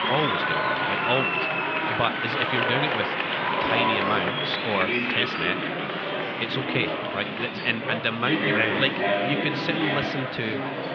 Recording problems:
muffled; slightly; fading above 3 kHz
thin; very slightly; fading below 550 Hz
murmuring crowd; very loud; throughout; 2 dB above the speech

